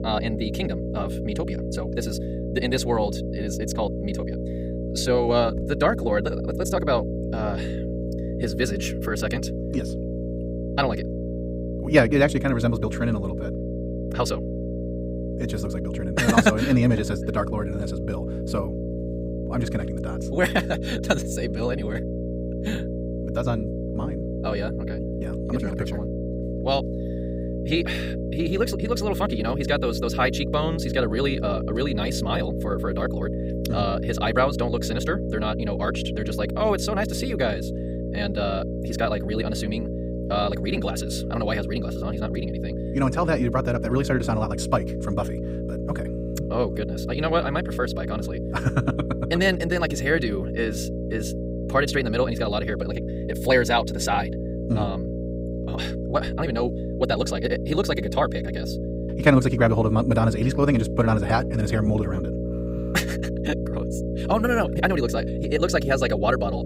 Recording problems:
wrong speed, natural pitch; too fast; 1.8 times normal speed
electrical hum; loud; throughout; 60 Hz, 8 dB below the speech

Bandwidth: 15.5 kHz